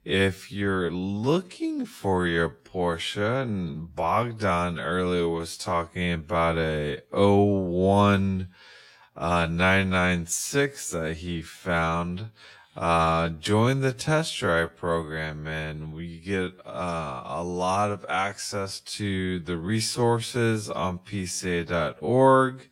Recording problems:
wrong speed, natural pitch; too slow; 0.6 times normal speed

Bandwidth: 16.5 kHz